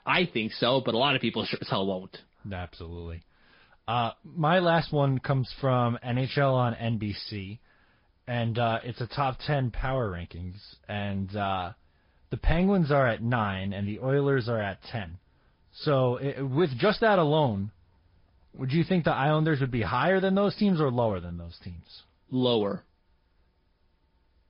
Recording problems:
high frequencies cut off; noticeable; nothing above 5 kHz
garbled, watery; slightly

